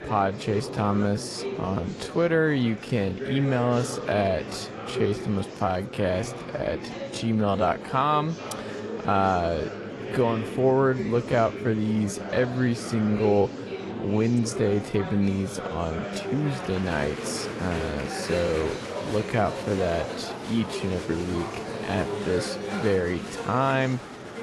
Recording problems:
wrong speed, natural pitch; too slow; 0.6 times normal speed
garbled, watery; slightly; nothing above 11.5 kHz
murmuring crowd; loud; throughout; 8 dB below the speech

